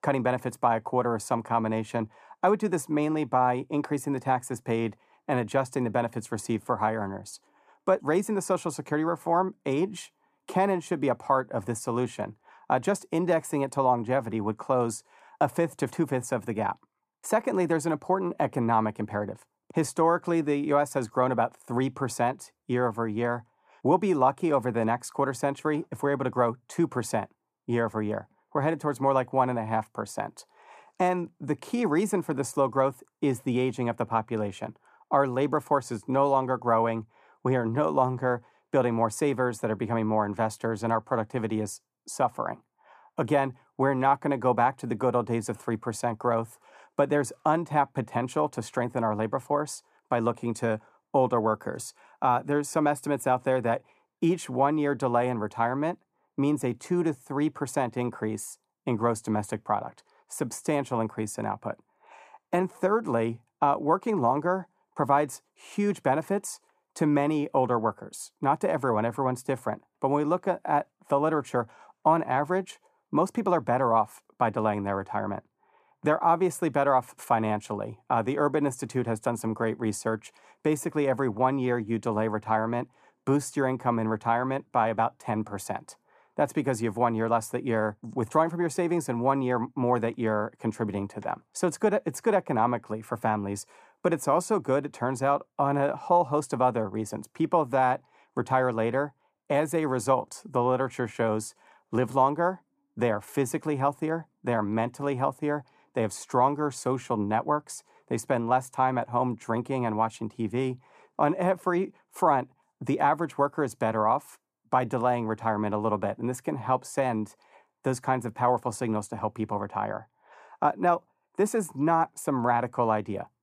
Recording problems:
muffled; slightly; fading above 1 kHz

